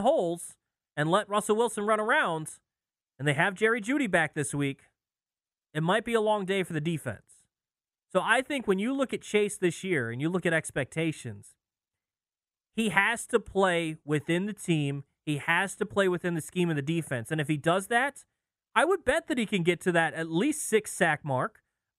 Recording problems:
abrupt cut into speech; at the start

